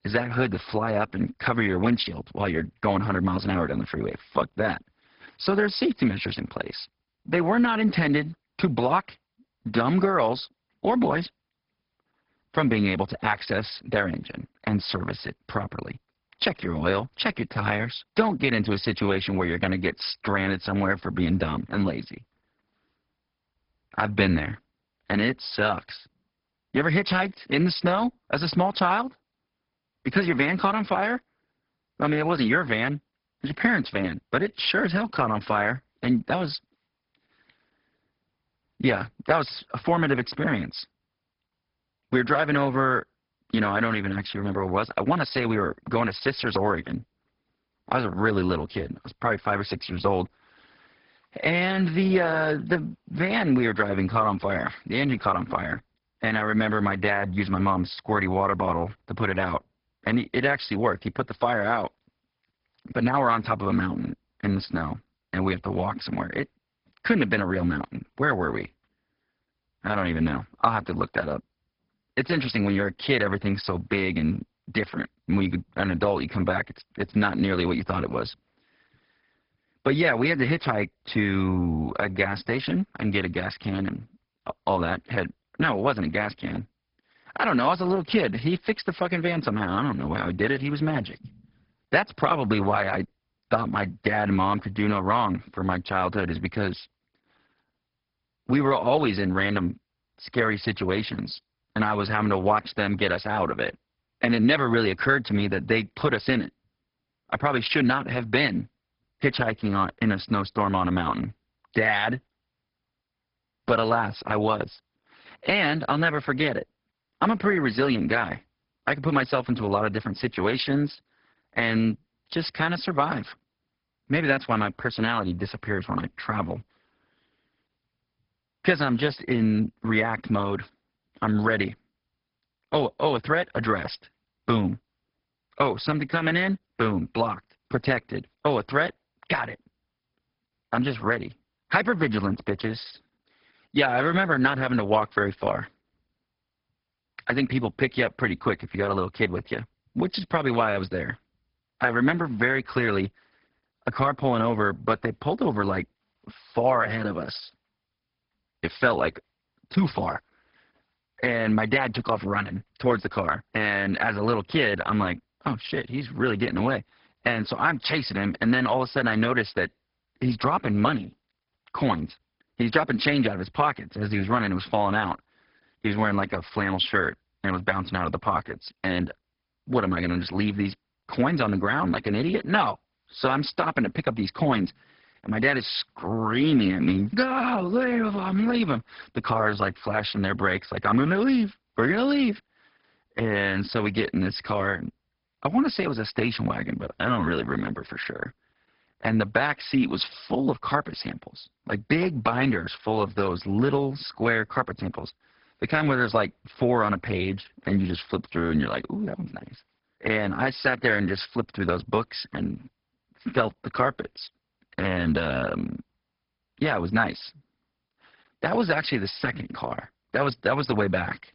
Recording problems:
garbled, watery; badly; nothing above 5 kHz

